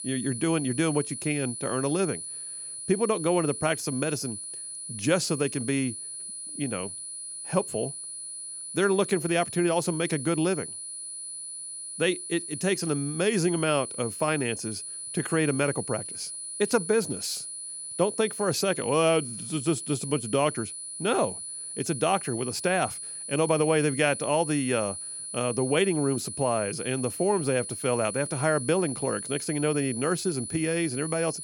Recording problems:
high-pitched whine; loud; throughout; 10 kHz, 7 dB below the speech

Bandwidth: 18 kHz